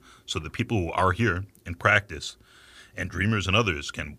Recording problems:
none

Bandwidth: 15 kHz